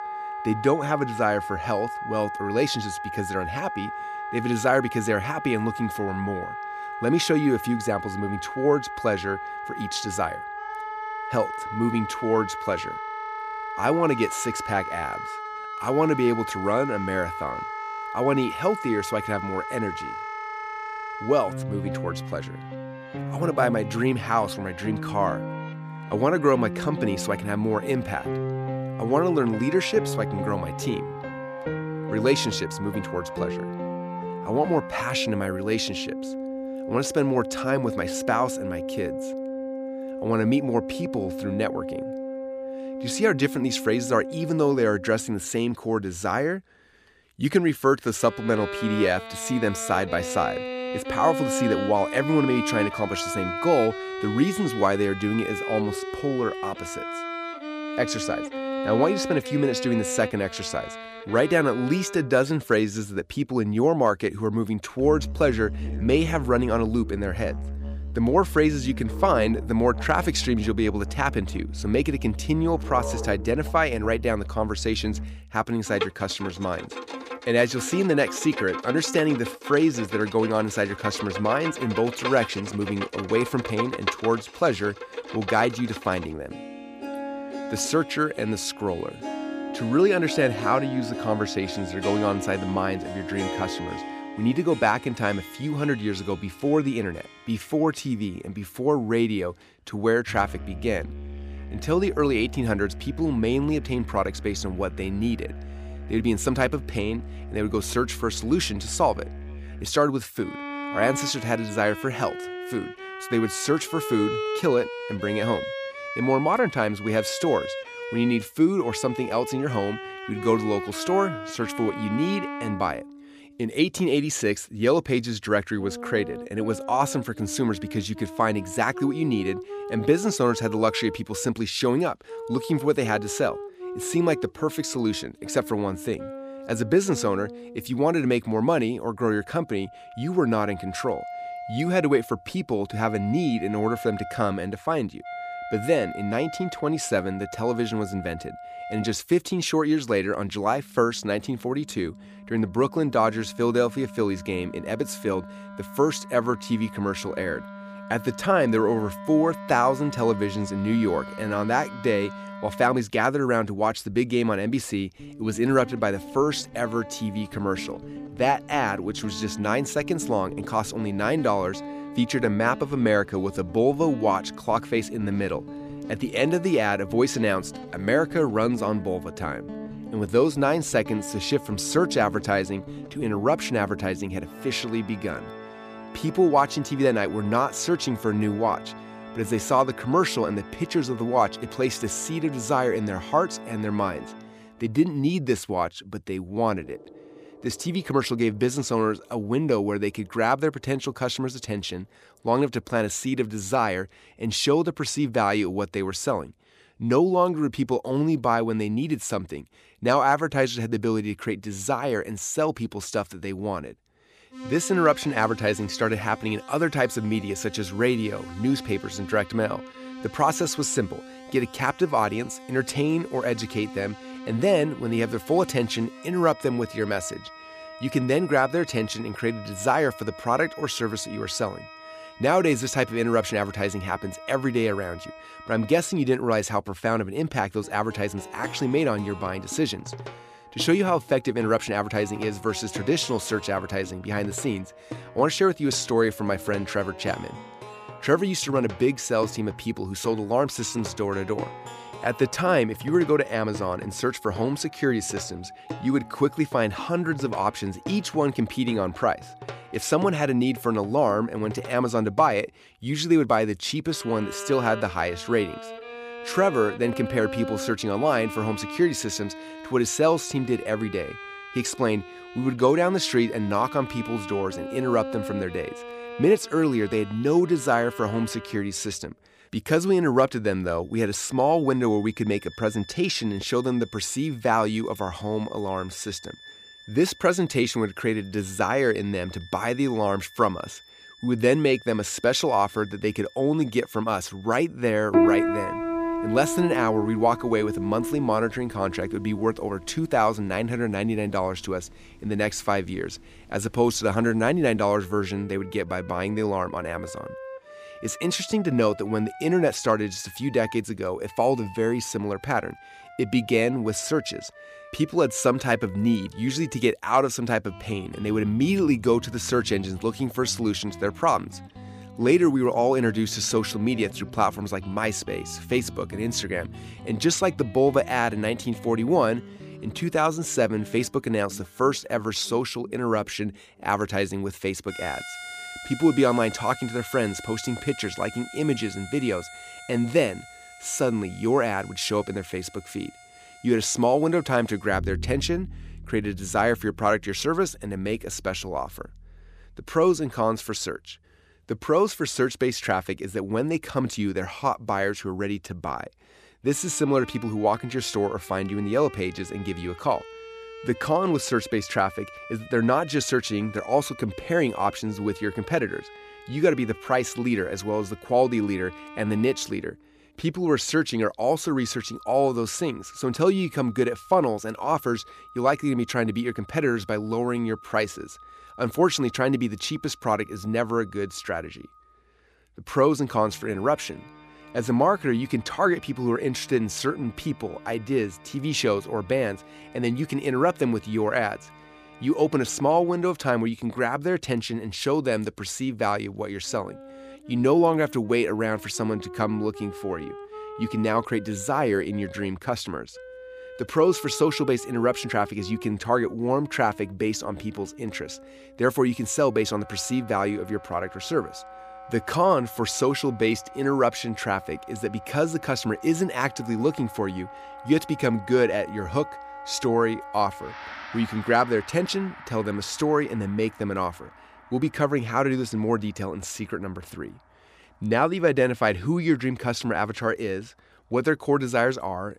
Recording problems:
background music; noticeable; throughout; 10 dB below the speech

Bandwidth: 15 kHz